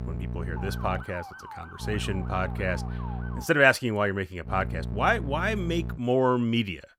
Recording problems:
electrical hum; noticeable; until 1 s, from 2 to 3.5 s and from 4.5 to 6 s; 60 Hz, 20 dB below the speech
siren; faint; from 0.5 to 3.5 s; peak 15 dB below the speech

